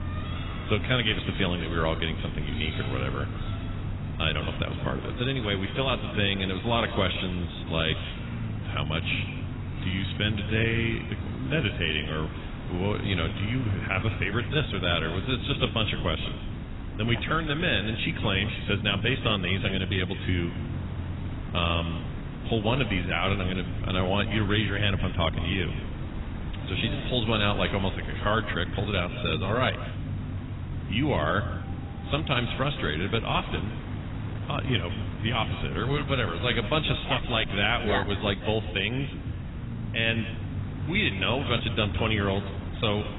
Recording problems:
garbled, watery; badly; nothing above 4 kHz
echo of what is said; noticeable; throughout; 160 ms later, 15 dB below the speech
wind noise on the microphone; occasional gusts; 20 dB below the speech
low rumble; noticeable; throughout; 20 dB below the speech
animal sounds; faint; throughout; 20 dB below the speech

